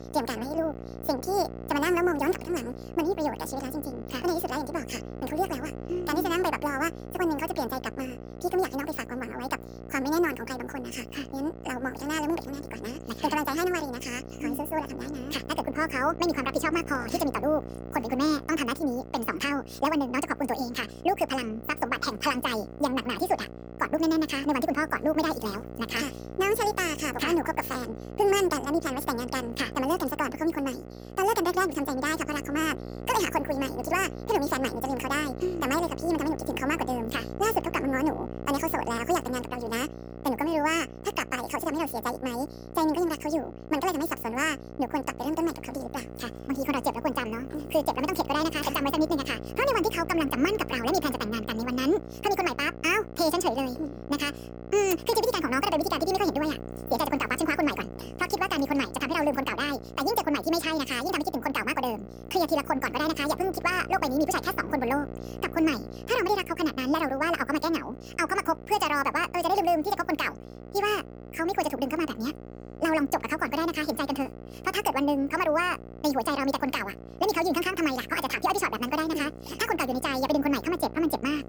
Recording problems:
wrong speed and pitch; too fast and too high; 1.7 times normal speed
electrical hum; noticeable; throughout; 60 Hz, 15 dB below the speech

